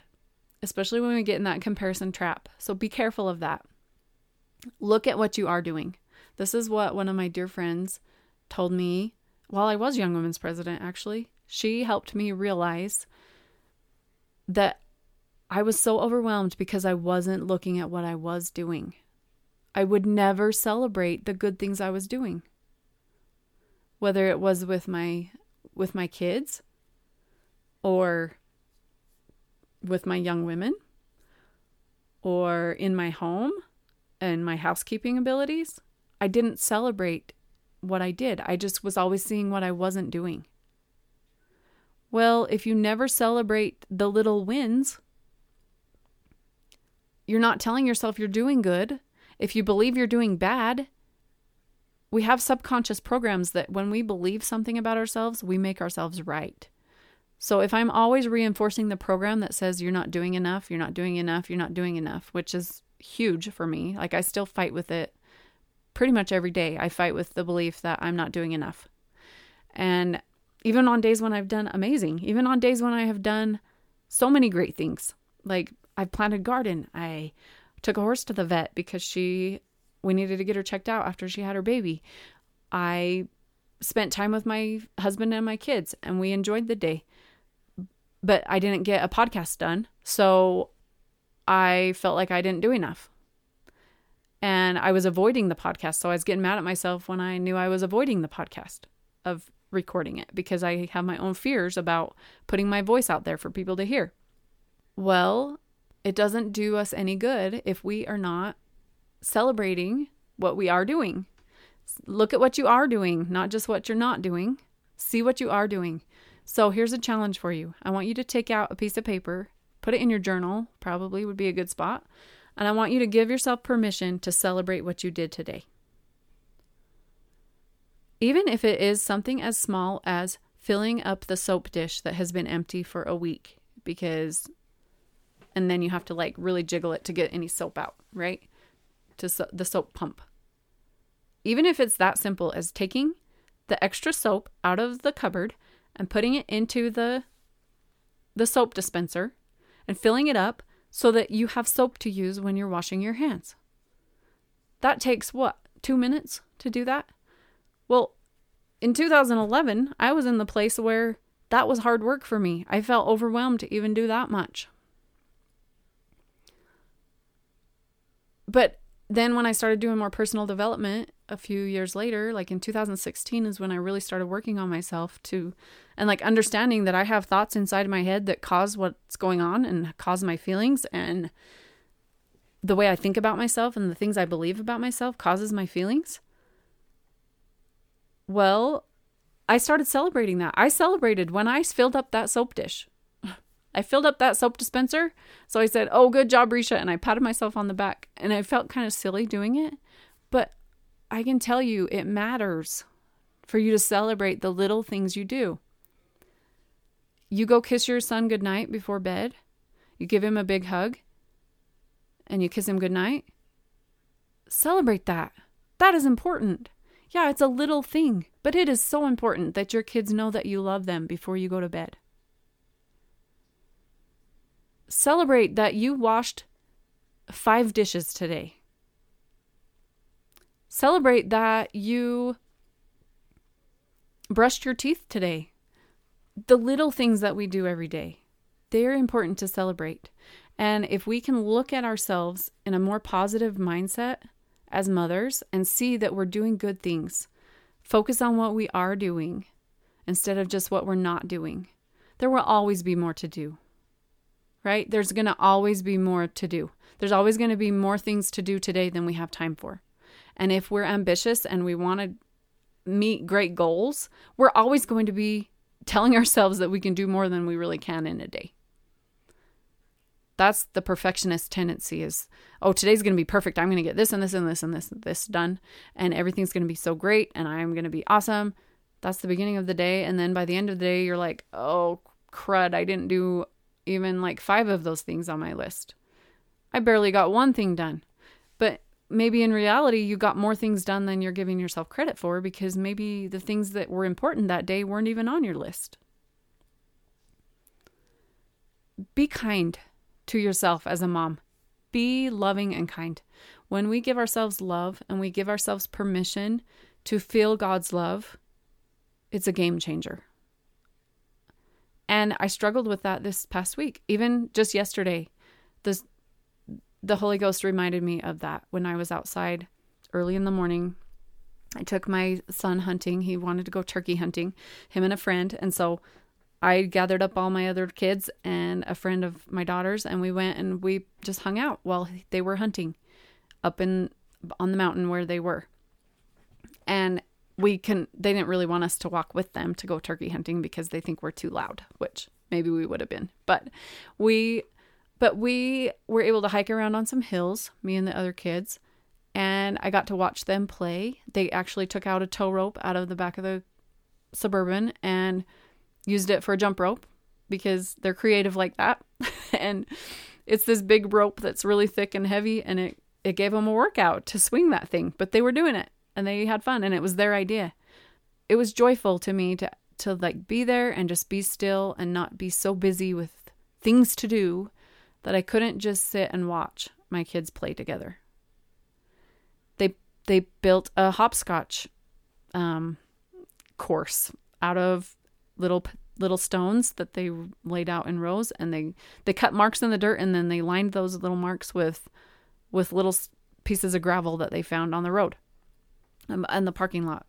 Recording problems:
none

